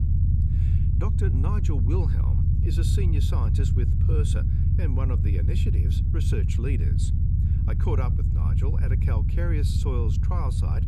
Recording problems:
low rumble; loud; throughout; 1 dB below the speech

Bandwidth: 15 kHz